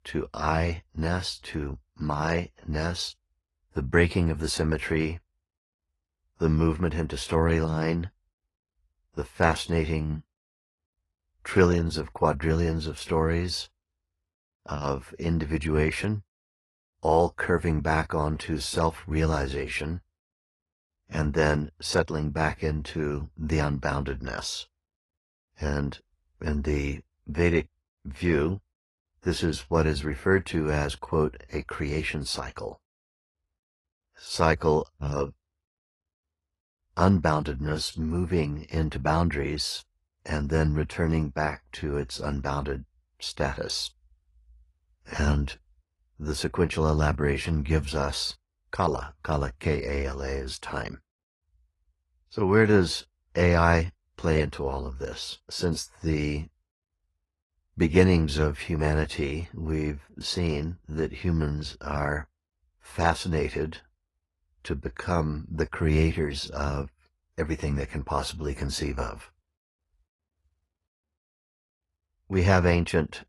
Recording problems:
garbled, watery; slightly; nothing above 11.5 kHz

